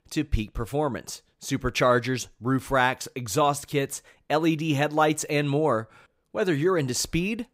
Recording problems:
none

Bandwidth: 15.5 kHz